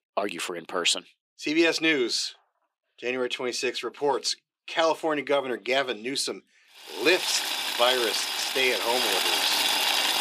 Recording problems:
thin; somewhat; fading below 300 Hz
household noises; very loud; from 7 s on; 2 dB above the speech

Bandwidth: 15.5 kHz